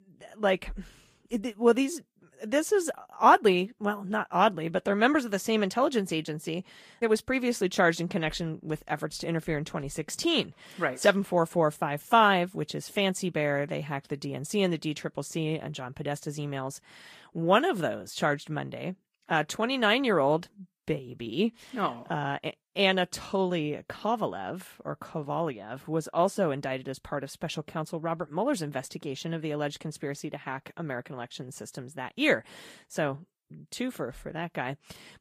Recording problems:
garbled, watery; slightly; nothing above 15 kHz

